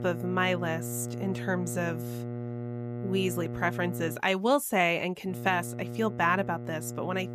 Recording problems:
electrical hum; noticeable; until 4 s and from 5.5 s on; 60 Hz, 15 dB below the speech

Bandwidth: 15 kHz